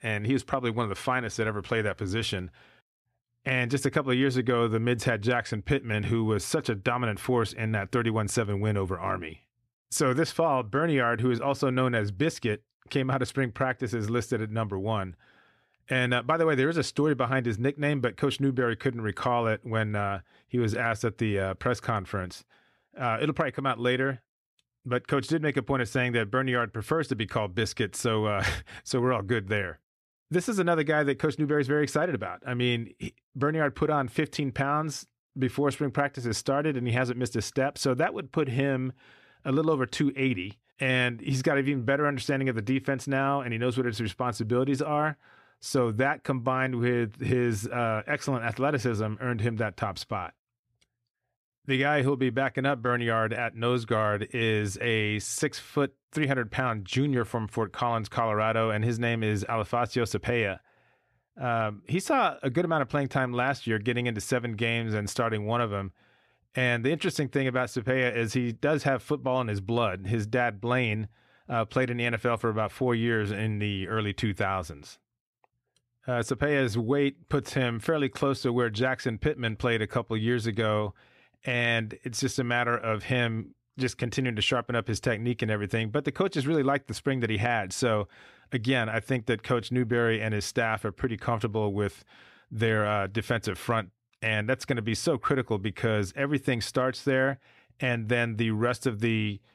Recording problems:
none

